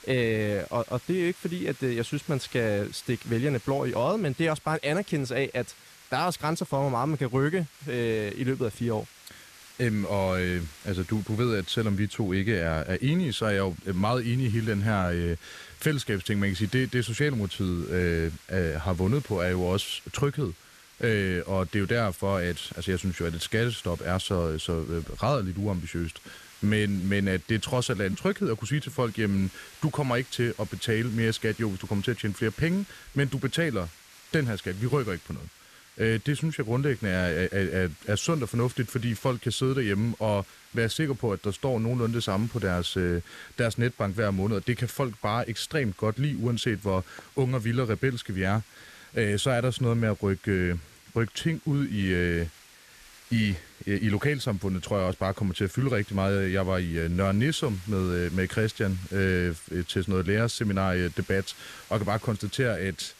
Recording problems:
hiss; faint; throughout; 20 dB below the speech

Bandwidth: 14 kHz